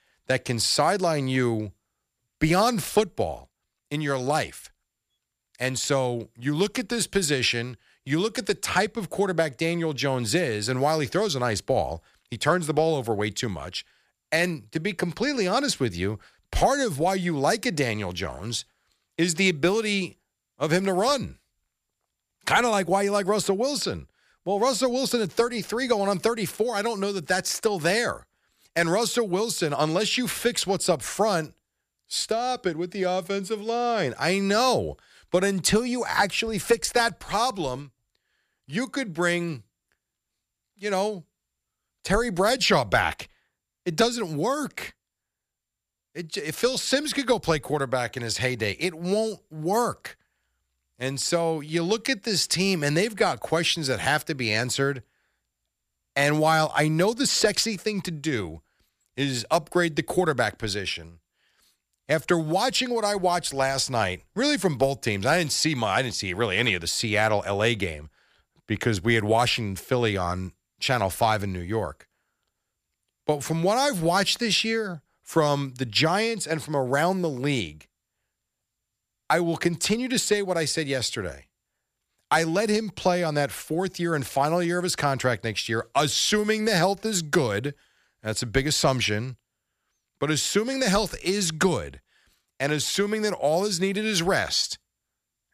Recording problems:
none

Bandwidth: 14.5 kHz